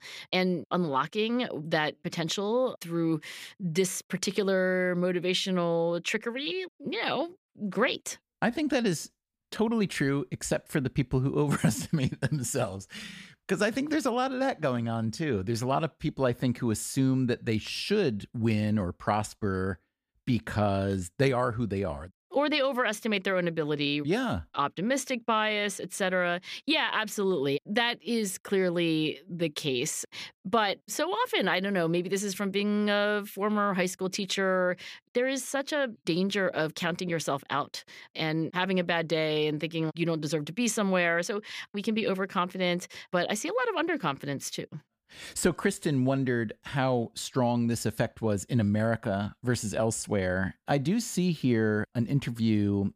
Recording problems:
none

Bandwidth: 15 kHz